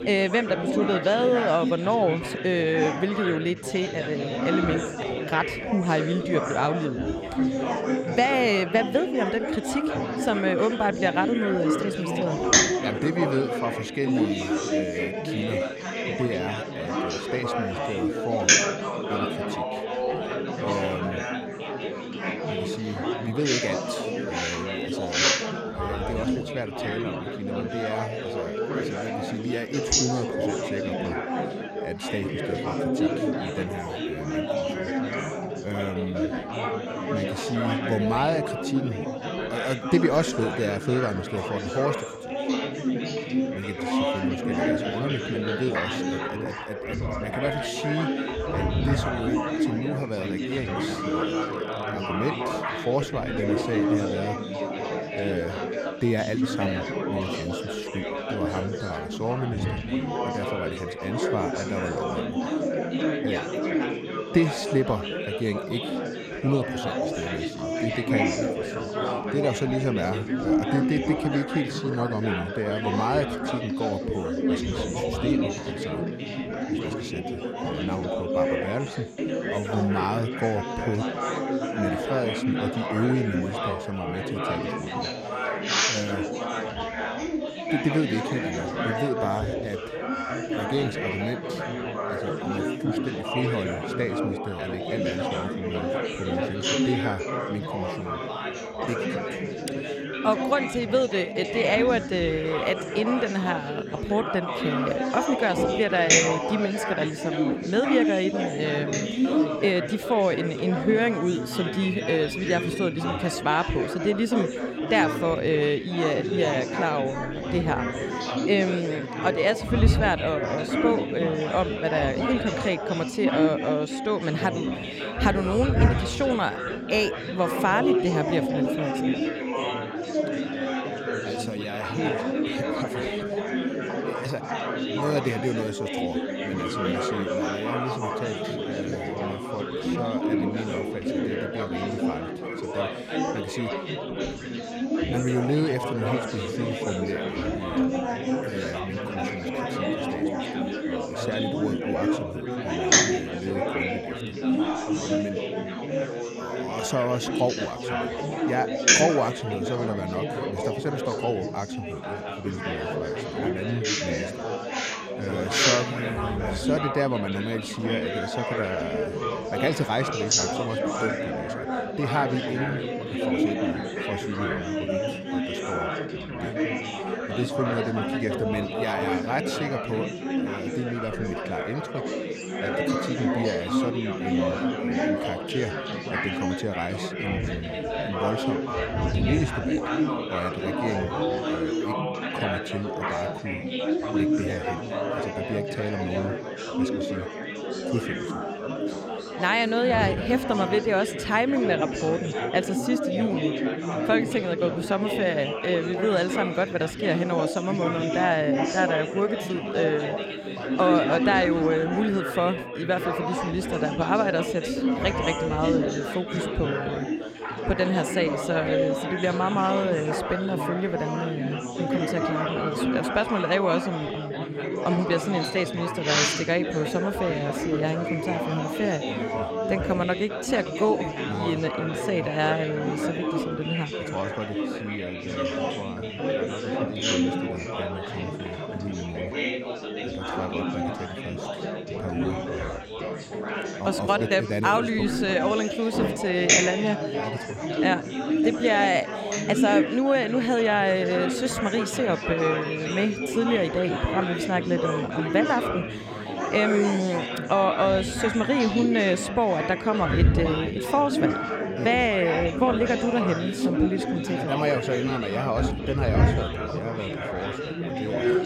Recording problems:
chatter from many people; very loud; throughout; as loud as the speech

